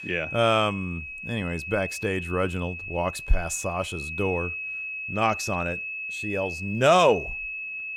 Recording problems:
high-pitched whine; loud; throughout; 2.5 kHz, 7 dB below the speech

